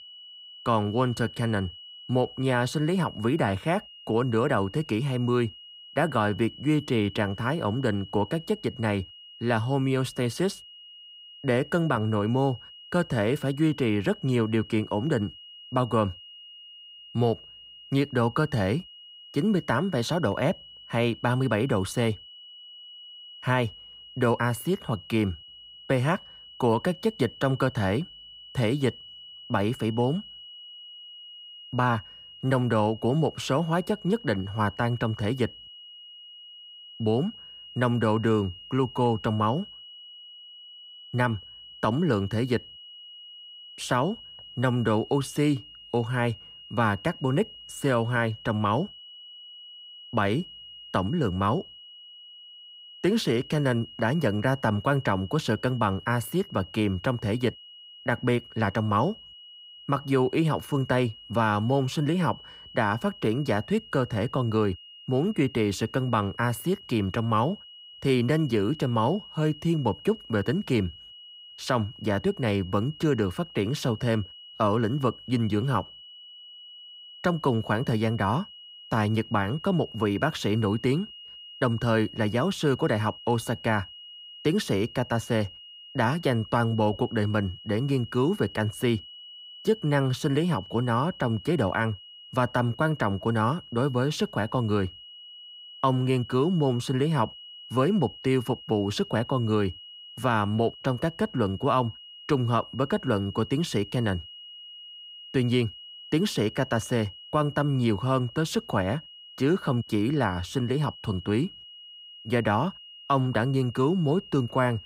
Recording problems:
high-pitched whine; noticeable; throughout; 3 kHz, 15 dB below the speech

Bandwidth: 15.5 kHz